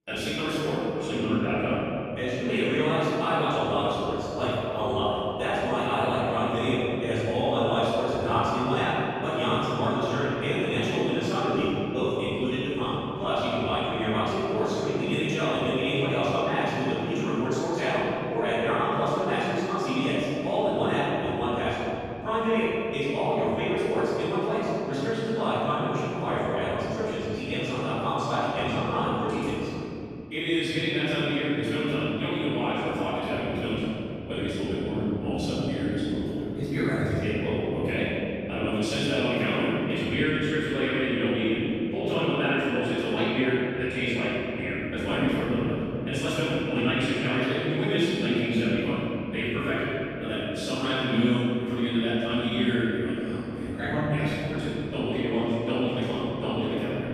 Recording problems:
room echo; strong; dies away in 3 s
off-mic speech; far
wrong speed, natural pitch; too fast; 1.5 times normal speed

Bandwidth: 14.5 kHz